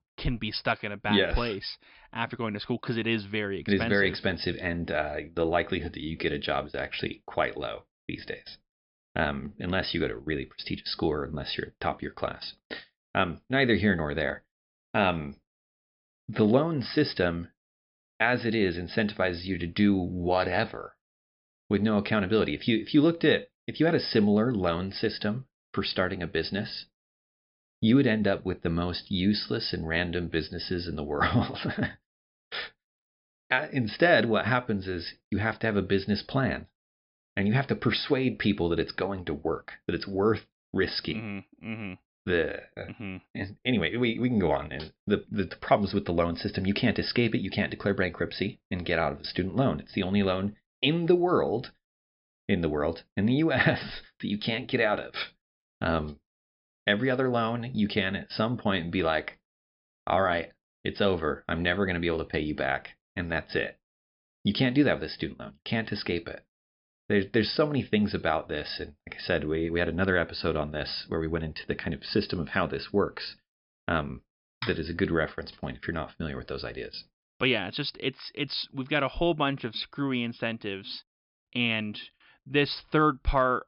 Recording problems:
high frequencies cut off; noticeable; nothing above 5.5 kHz

